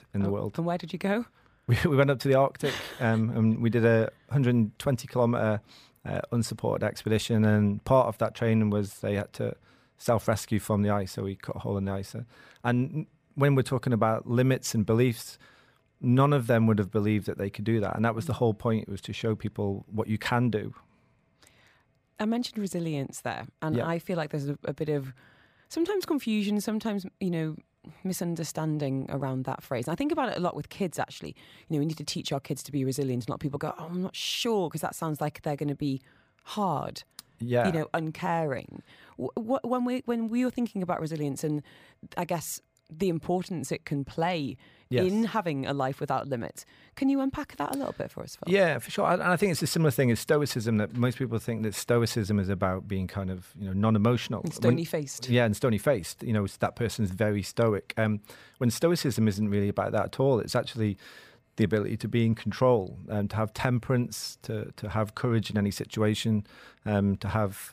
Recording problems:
none

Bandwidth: 15 kHz